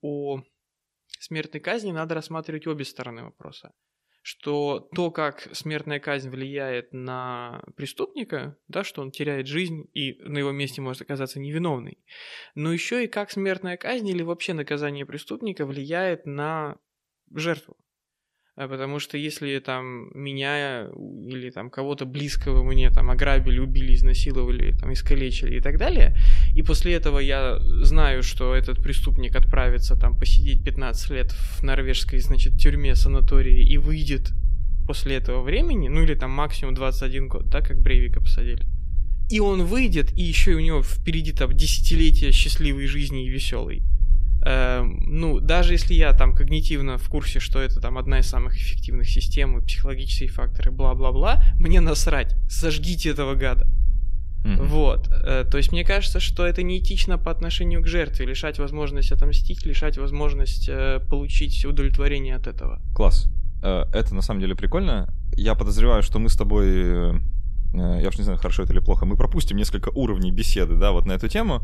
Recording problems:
low rumble; faint; from 22 s on; 20 dB below the speech

